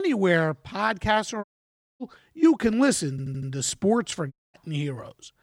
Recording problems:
abrupt cut into speech; at the start
audio cutting out; at 1.5 s for 0.5 s and at 4.5 s
audio stuttering; at 3 s

